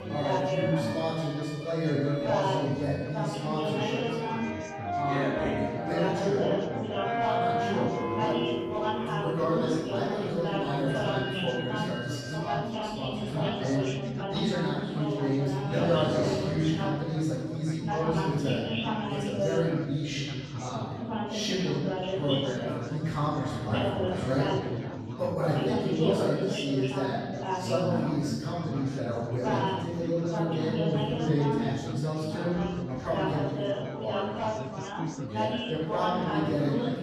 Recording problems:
room echo; strong; dies away in 1.4 s
off-mic speech; far
background music; loud; until 12 s; 4 dB below the speech
chatter from many people; loud; throughout; 2 dB below the speech

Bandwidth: 14 kHz